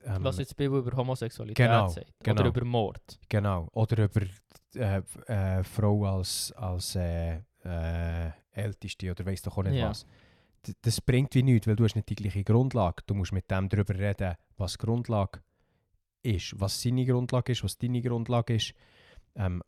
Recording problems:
none

